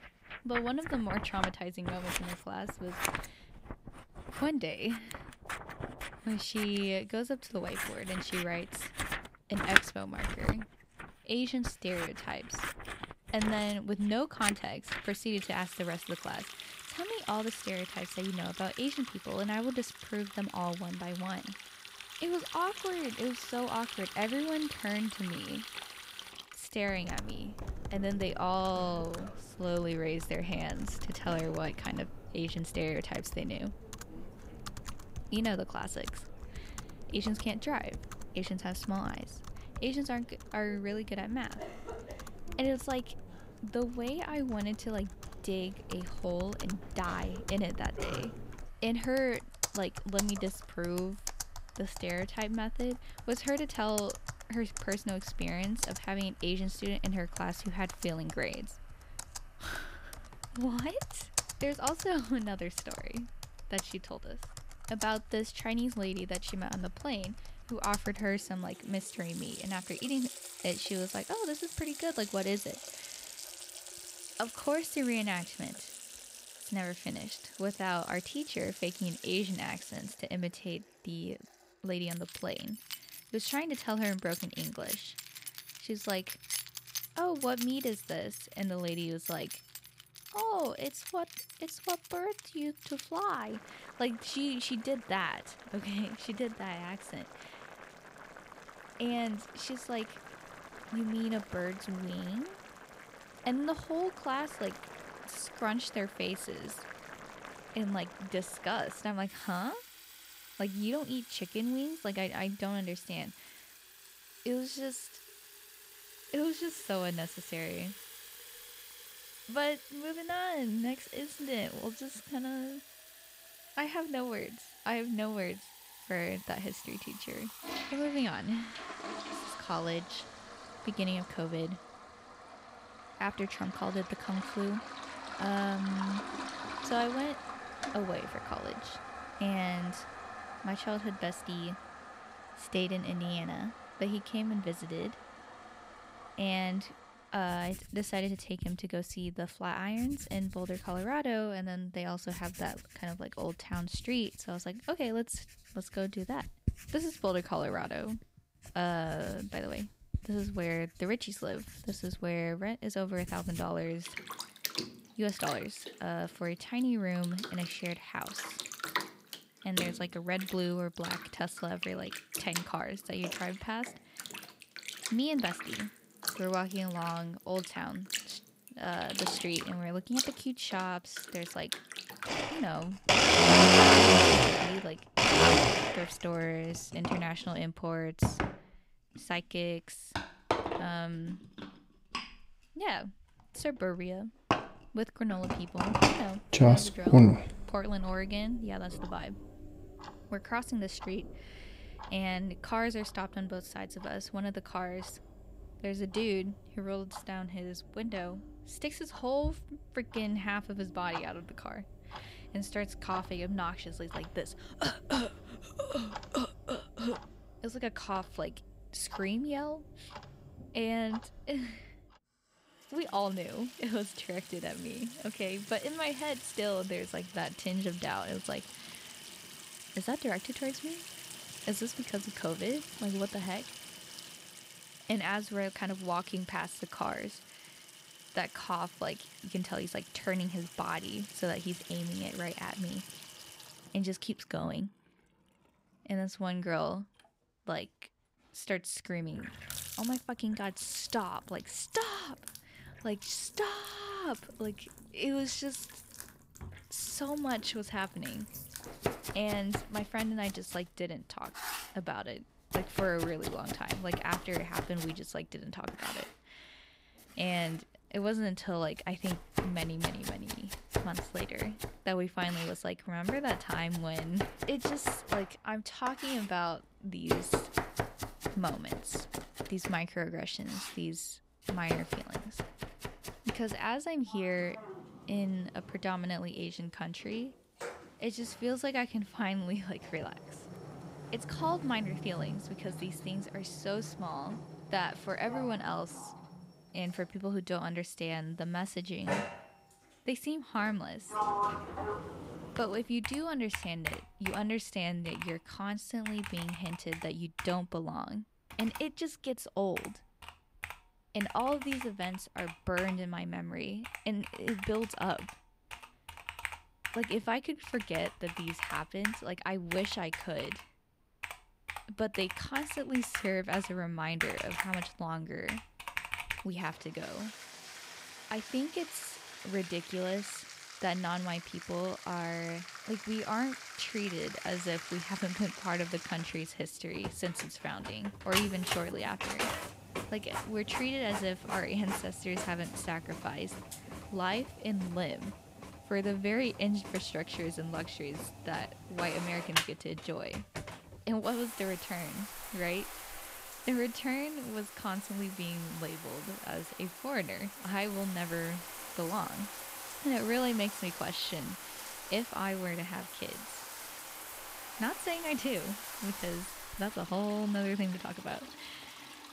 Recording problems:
household noises; very loud; throughout; as loud as the speech

